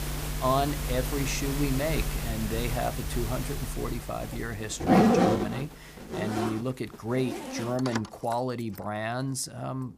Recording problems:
household noises; very loud; throughout; 2 dB above the speech

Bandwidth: 15 kHz